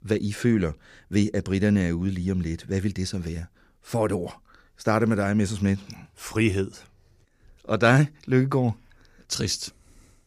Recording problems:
none

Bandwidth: 15 kHz